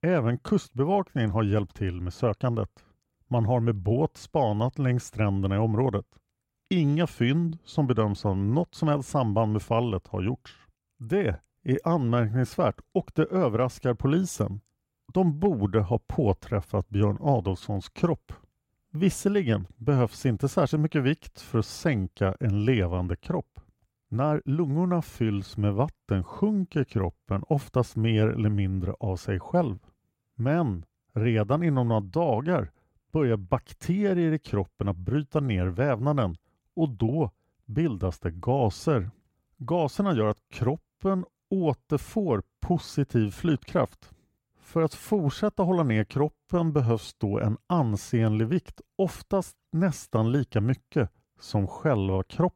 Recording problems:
uneven, jittery; strongly; from 12 to 47 s

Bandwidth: 16 kHz